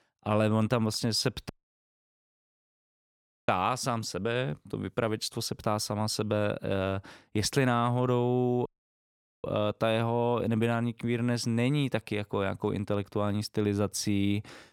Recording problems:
audio cutting out; at 1.5 s for 2 s and at 8.5 s for 1 s

